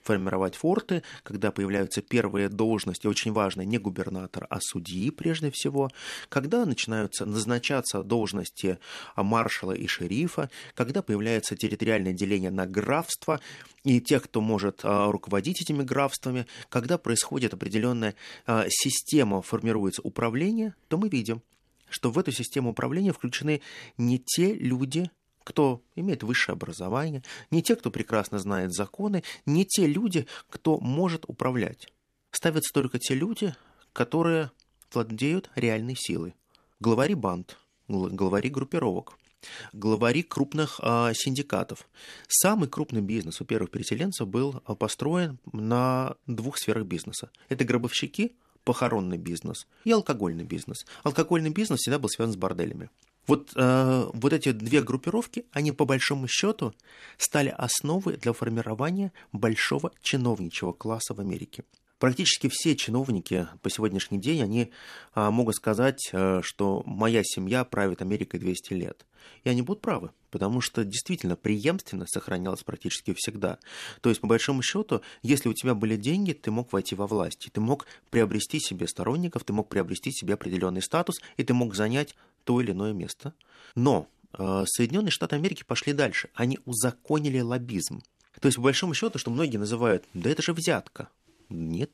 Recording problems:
none

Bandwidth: 13.5 kHz